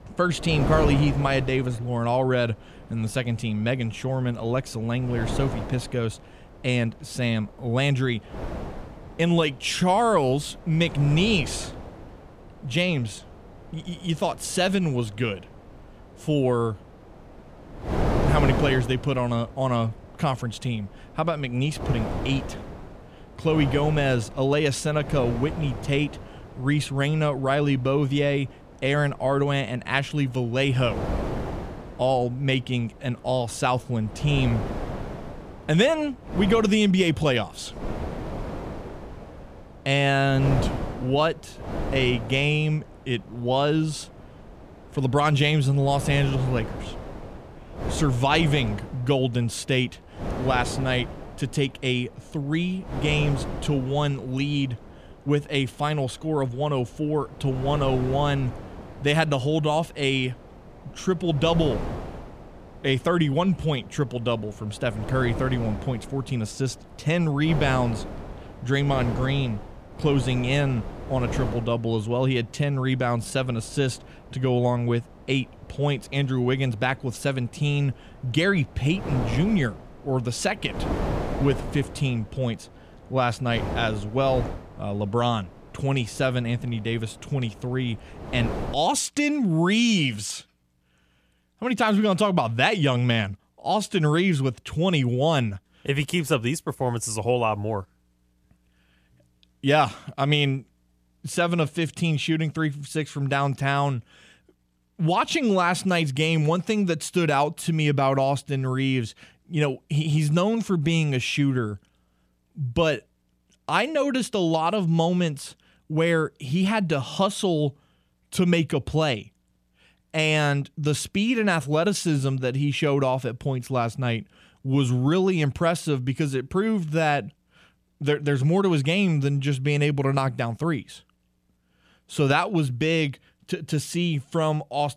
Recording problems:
wind noise on the microphone; occasional gusts; until 1:29; 10 dB below the speech

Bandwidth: 14.5 kHz